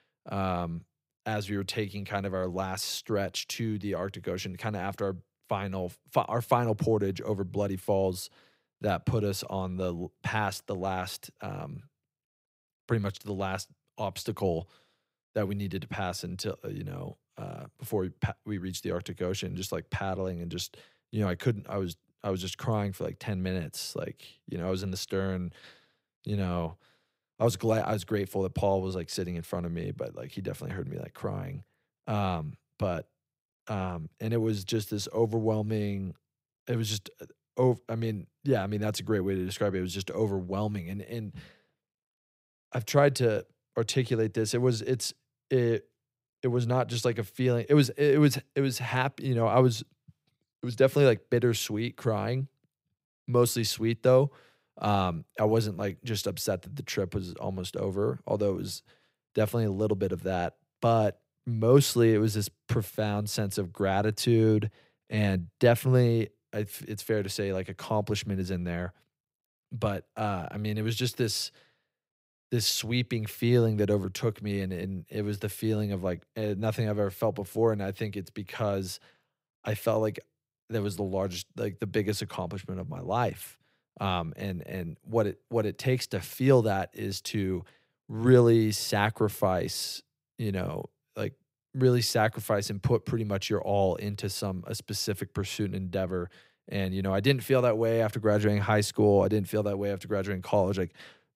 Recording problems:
none

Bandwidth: 15.5 kHz